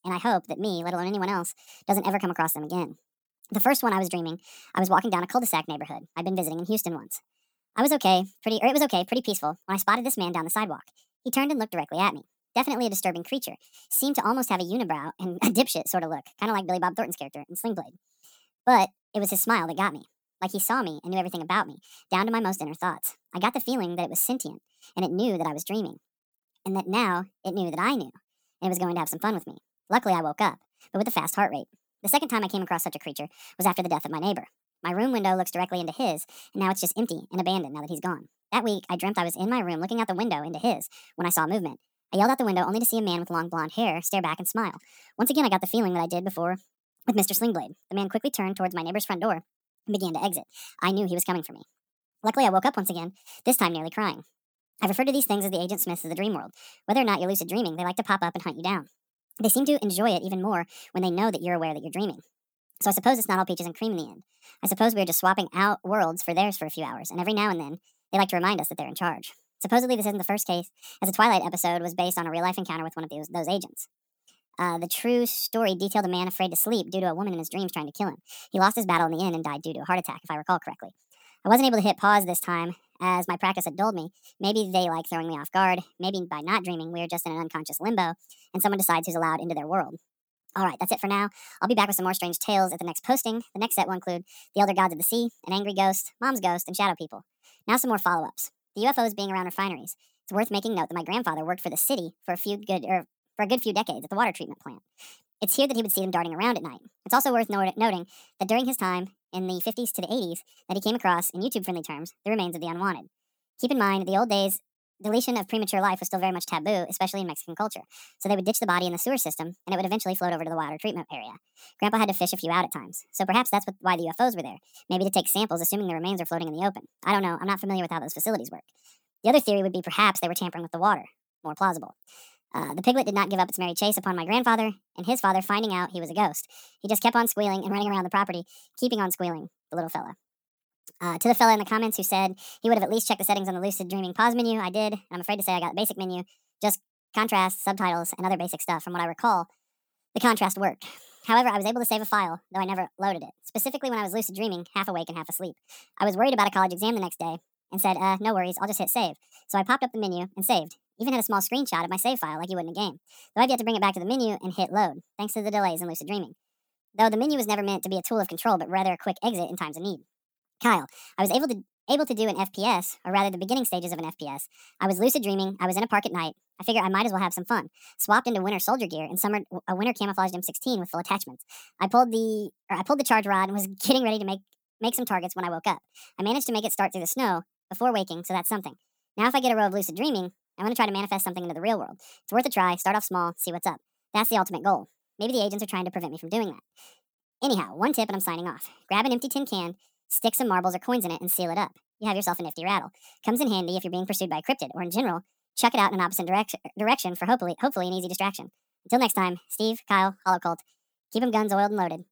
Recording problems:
wrong speed and pitch; too fast and too high; 1.5 times normal speed

